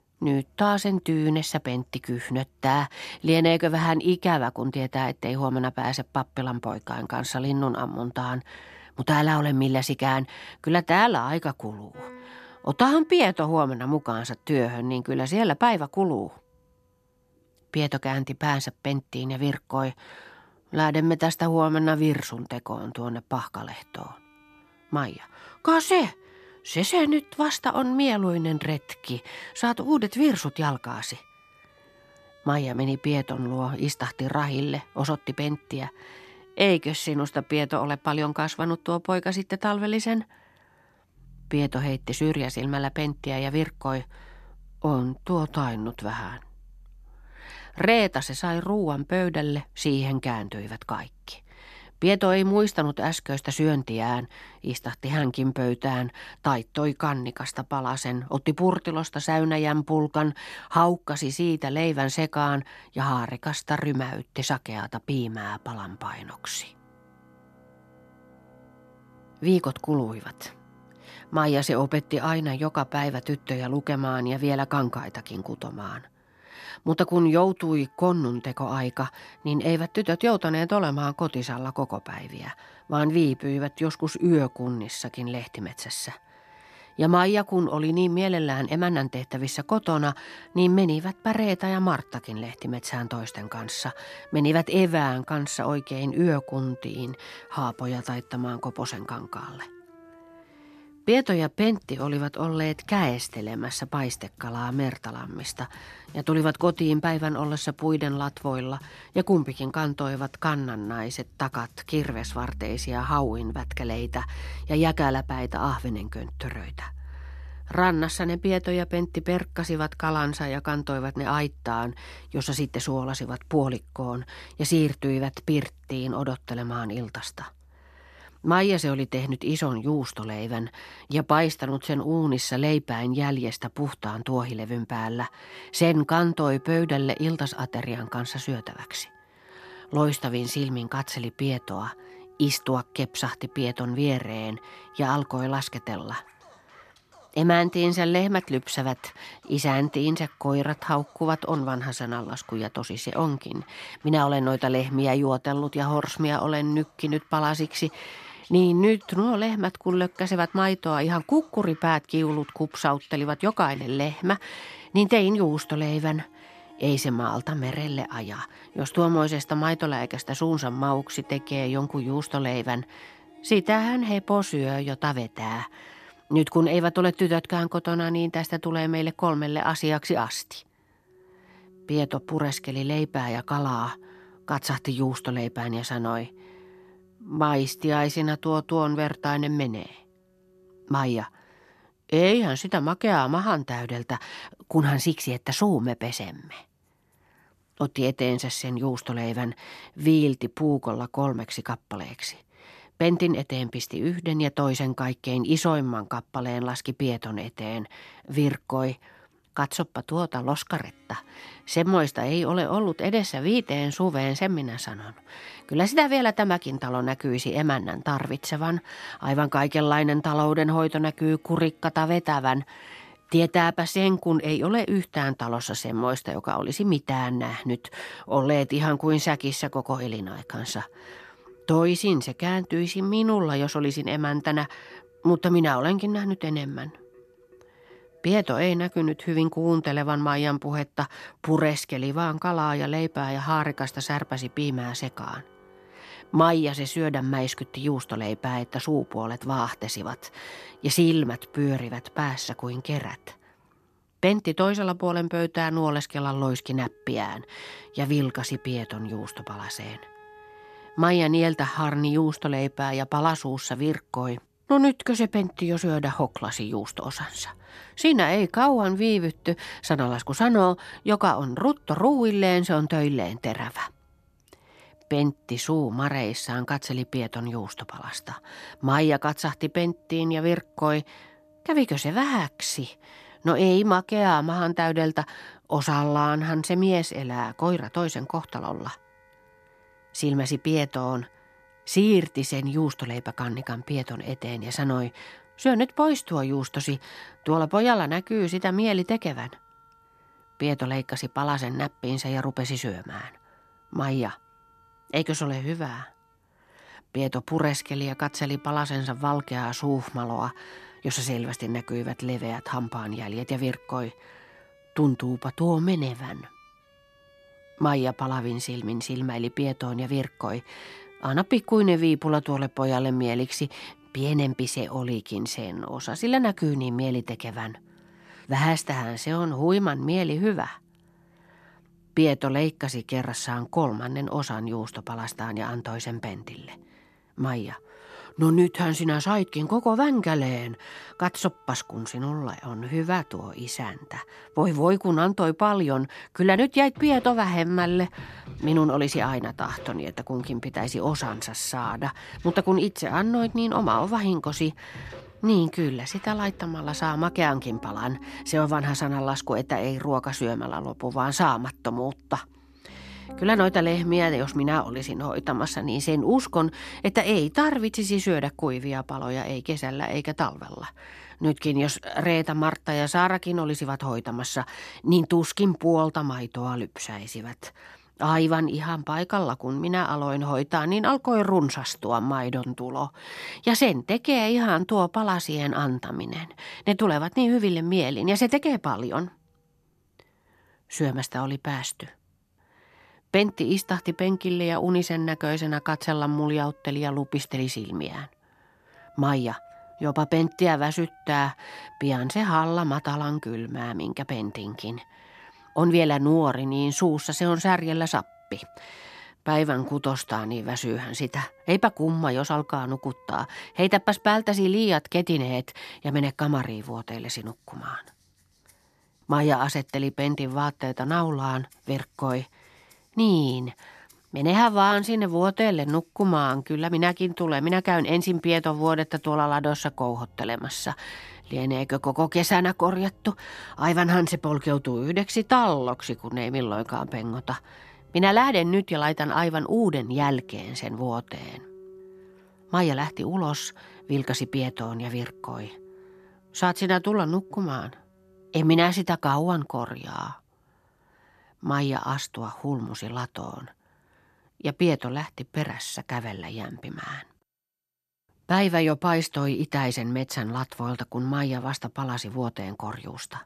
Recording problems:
background music; faint; throughout; 25 dB below the speech

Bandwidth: 14 kHz